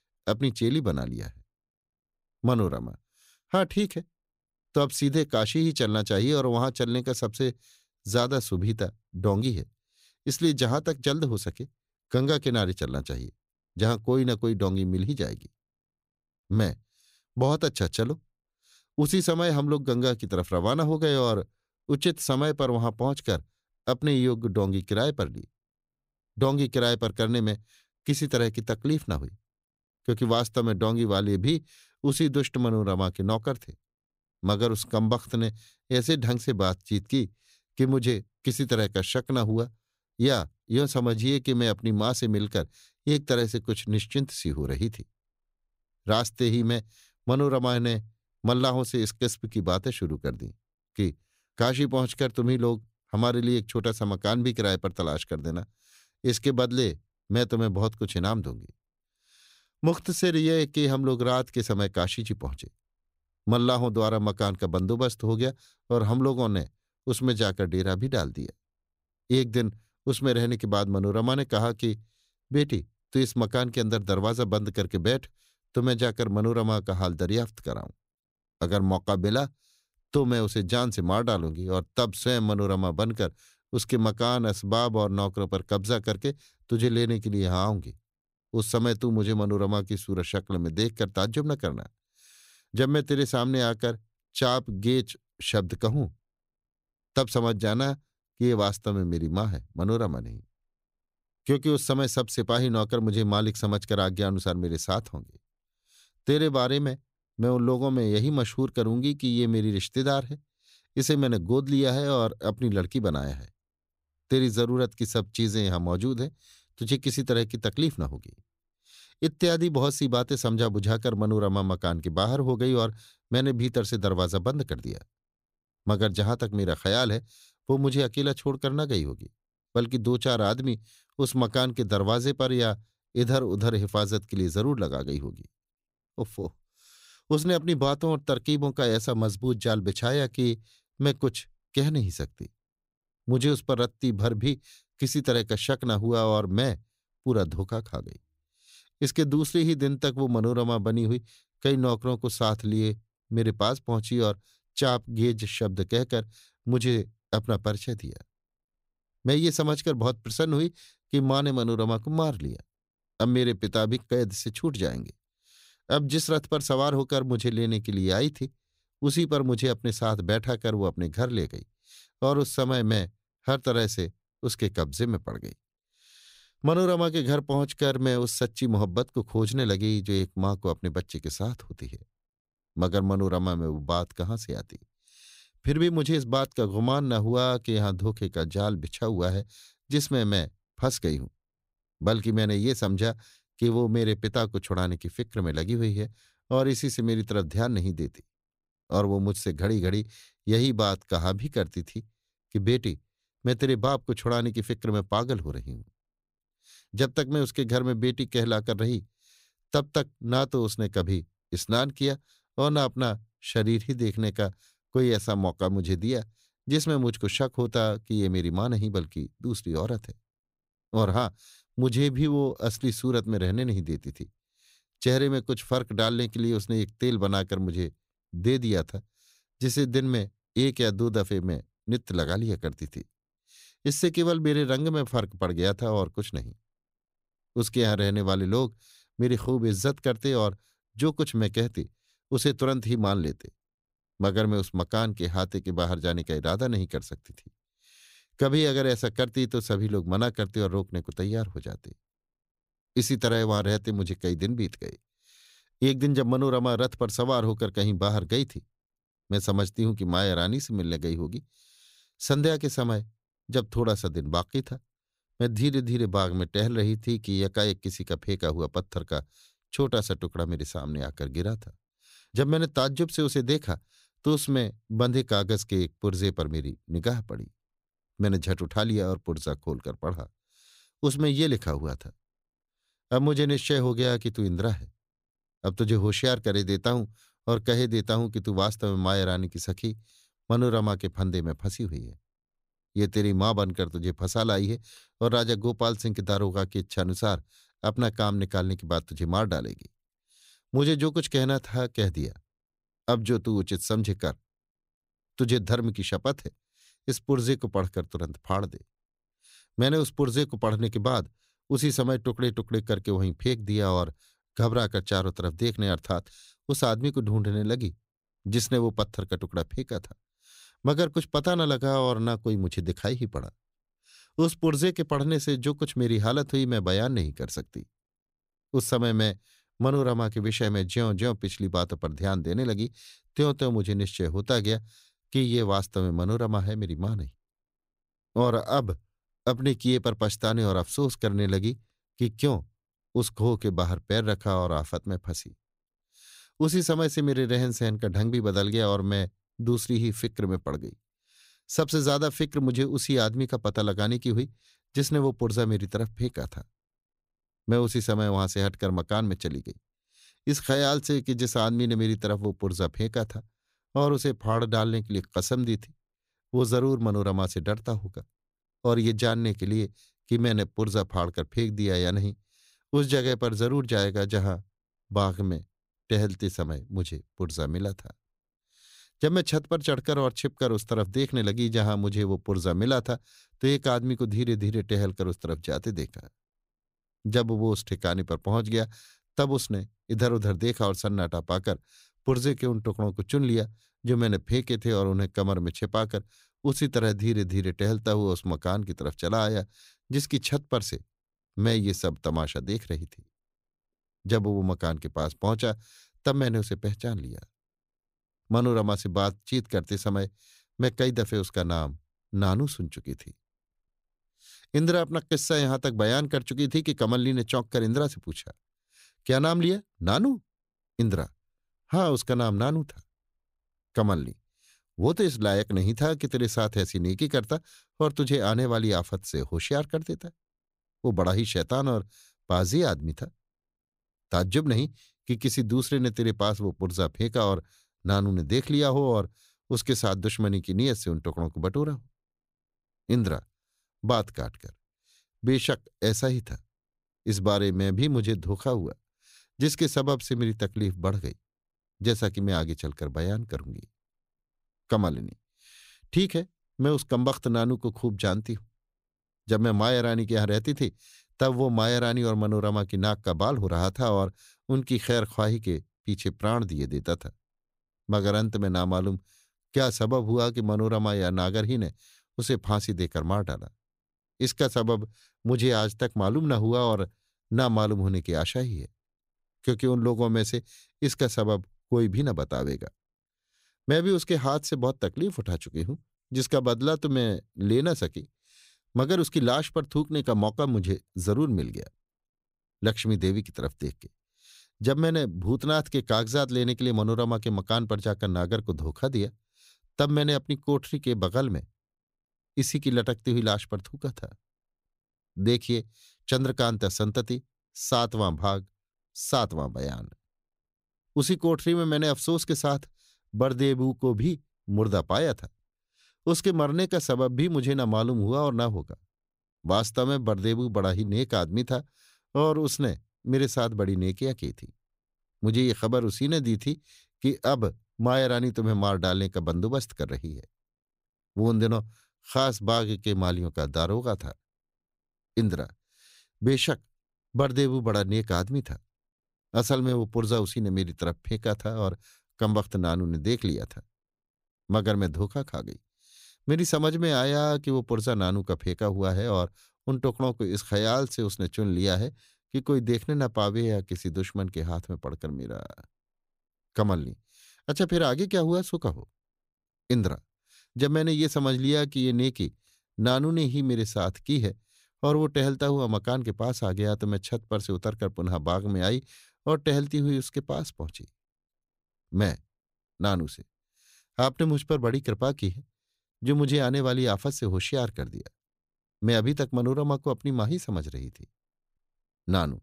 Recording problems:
none

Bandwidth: 15.5 kHz